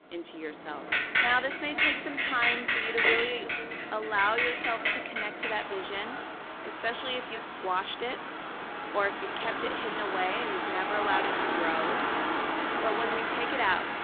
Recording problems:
phone-call audio; poor line
echo of what is said; noticeable; throughout; 490 ms later, 15 dB below the speech
traffic noise; very loud; throughout; 2 dB above the speech

